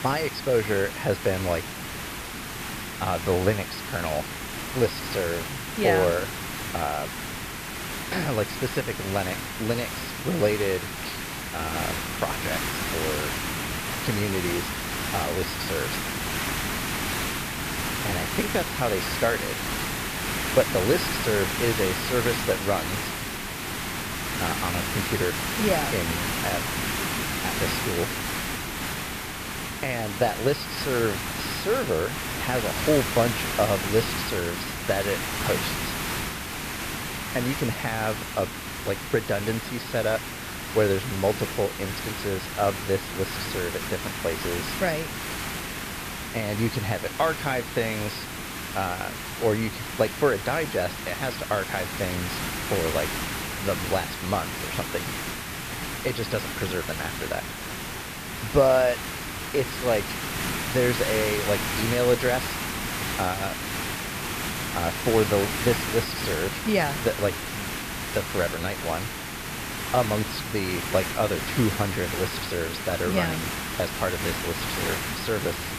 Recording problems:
high frequencies cut off; noticeable; nothing above 5.5 kHz
hiss; loud; throughout; 2 dB below the speech

